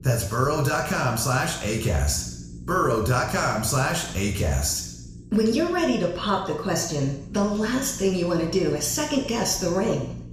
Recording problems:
room echo; noticeable; dies away in 0.7 s
off-mic speech; somewhat distant
low rumble; faint; throughout; 25 dB below the speech

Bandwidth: 15 kHz